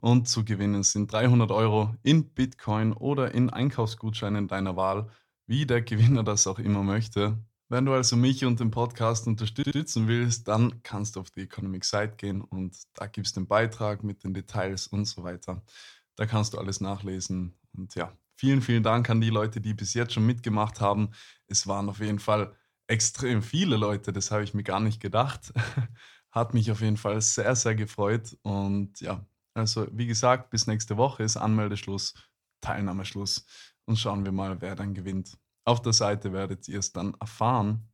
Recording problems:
audio stuttering; at 9.5 s

